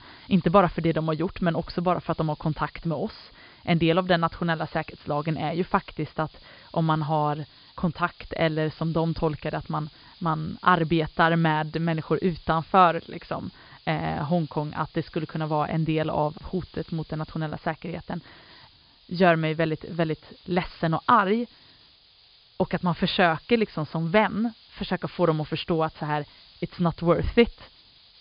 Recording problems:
high frequencies cut off; severe; nothing above 5 kHz
hiss; faint; throughout; 25 dB below the speech

